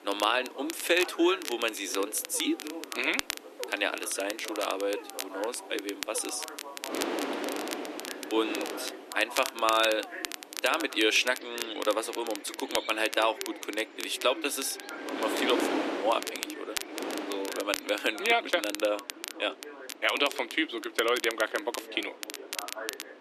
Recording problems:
thin; somewhat; fading below 300 Hz
wind noise on the microphone; heavy; 7 dB below the speech
crackle, like an old record; loud; 10 dB below the speech
animal sounds; noticeable; until 18 s; 20 dB below the speech
voice in the background; noticeable; throughout; 15 dB below the speech

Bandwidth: 13.5 kHz